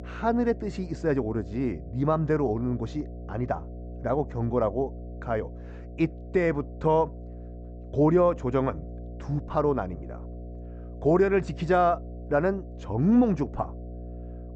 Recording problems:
high frequencies cut off; noticeable; nothing above 8 kHz
muffled; very slightly; fading above 2 kHz
electrical hum; faint; throughout; 60 Hz, 20 dB below the speech

